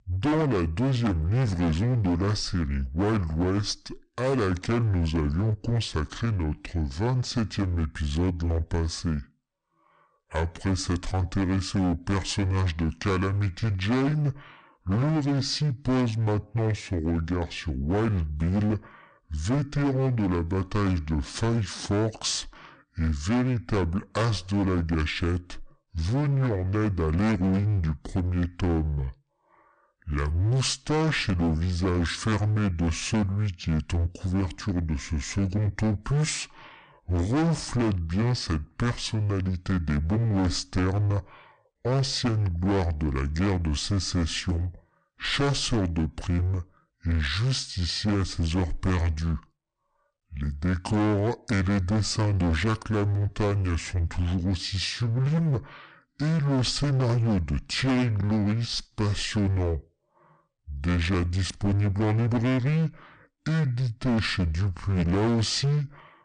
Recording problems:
distortion; heavy; 20% of the sound clipped
wrong speed and pitch; too slow and too low; 0.7 times normal speed

